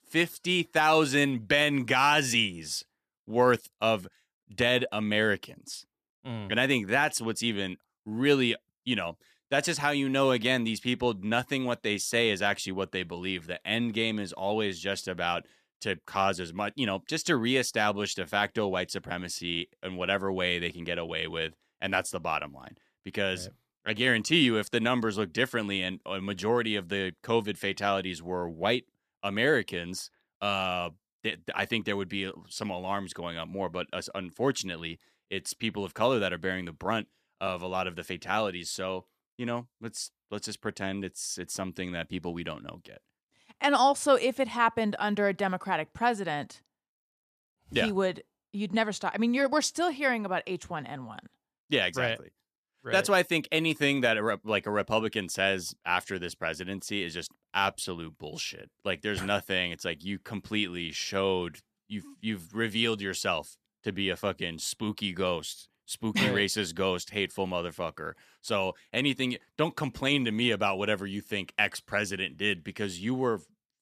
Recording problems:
none

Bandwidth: 14.5 kHz